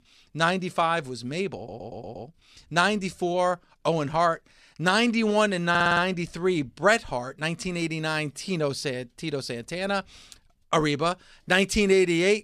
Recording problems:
audio stuttering; at 1.5 s and at 5.5 s

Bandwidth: 14 kHz